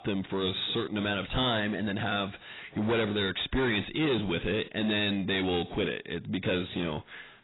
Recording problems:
distortion; heavy; 7 dB below the speech
garbled, watery; badly; nothing above 4 kHz

